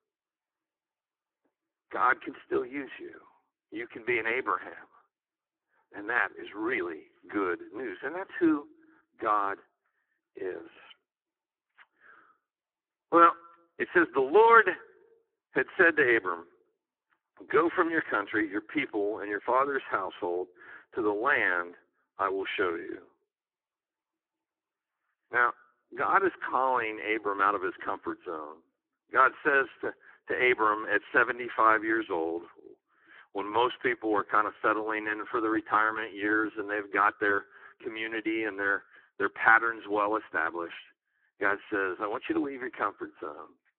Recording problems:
phone-call audio; poor line

